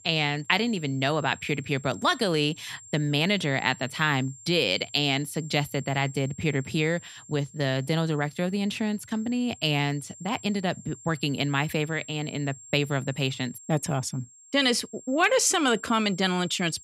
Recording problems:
high-pitched whine; noticeable; throughout; 7.5 kHz, 20 dB below the speech

